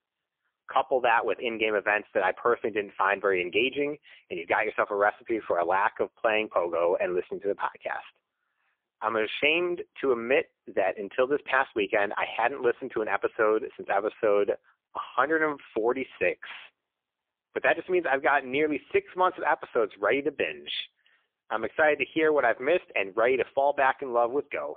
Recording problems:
phone-call audio; poor line; nothing above 3.5 kHz

